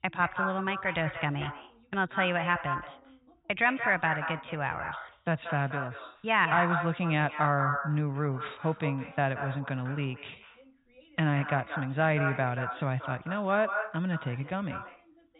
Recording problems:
echo of what is said; strong; throughout; 180 ms later, 6 dB below the speech
high frequencies cut off; severe; nothing above 4 kHz
voice in the background; faint; throughout; 30 dB below the speech

